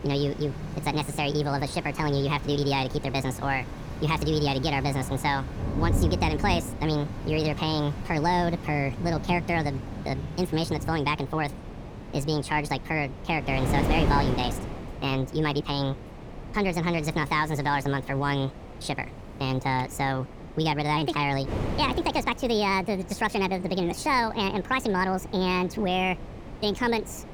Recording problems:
wrong speed and pitch; too fast and too high; 1.6 times normal speed
rain or running water; loud; throughout; 9 dB below the speech
wind noise on the microphone; occasional gusts; 15 dB below the speech

